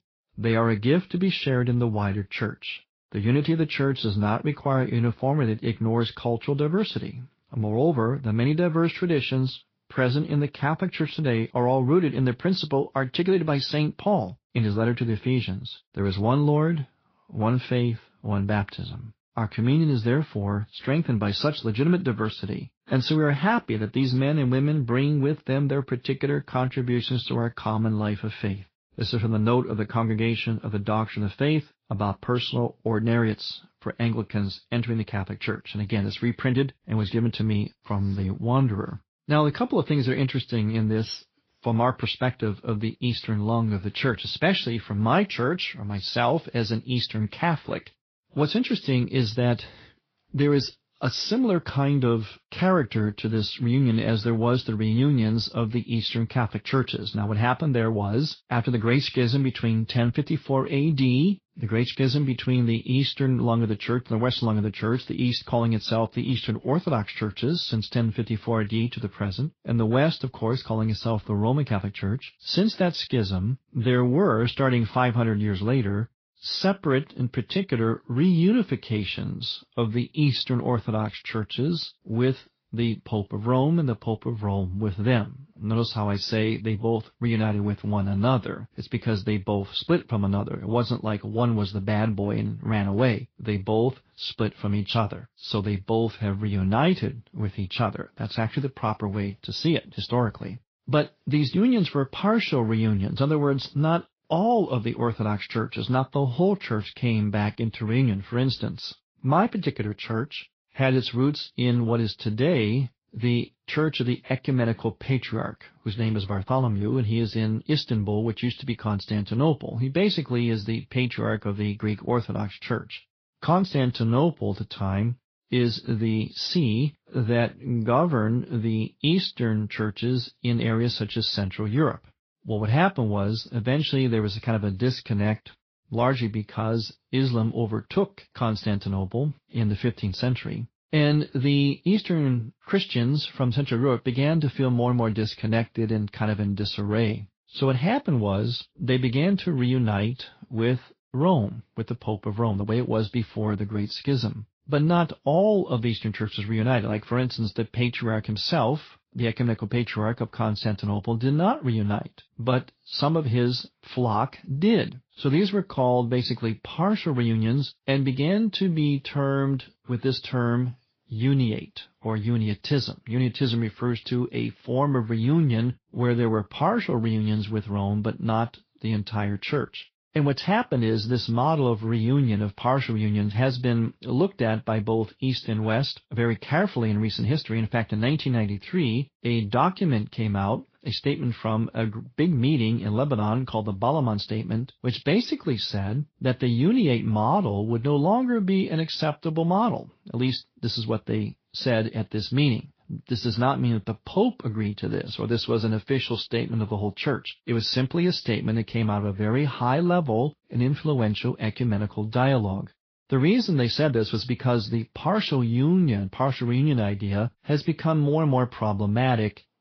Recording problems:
high frequencies cut off; noticeable; nothing above 5.5 kHz
garbled, watery; slightly

